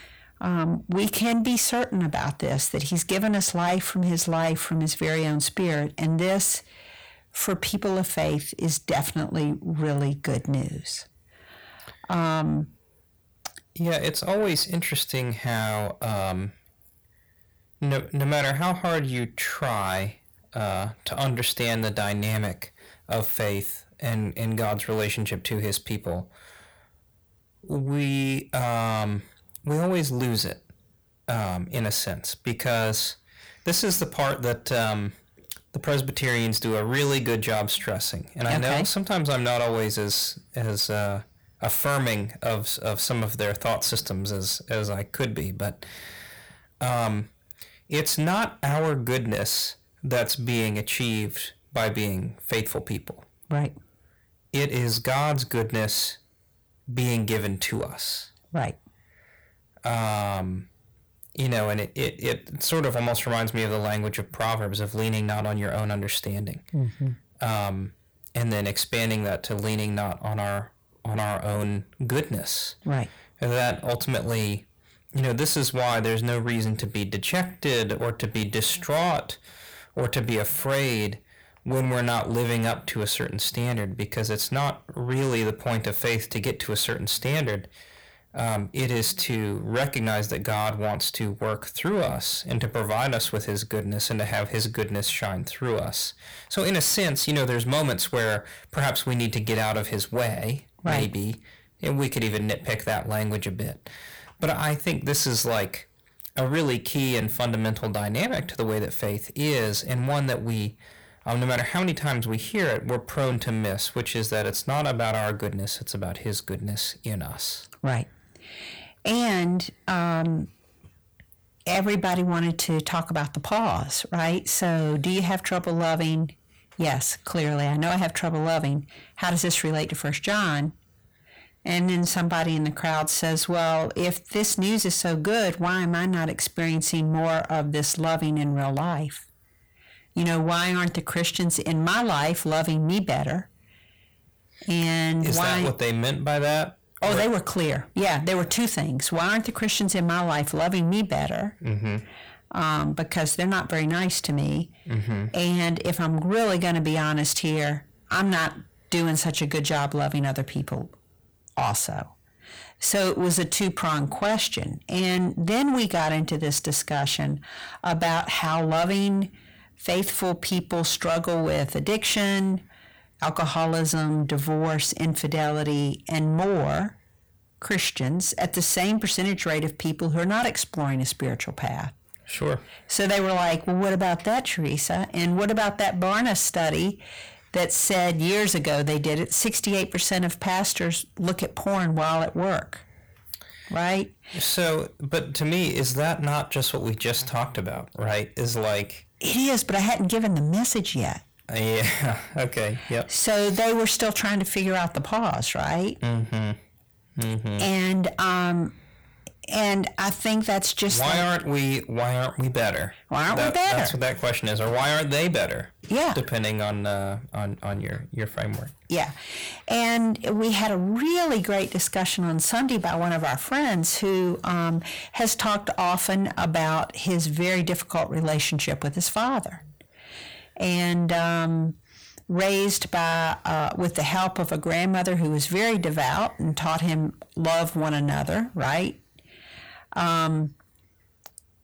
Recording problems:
distortion; heavy; 7 dB below the speech

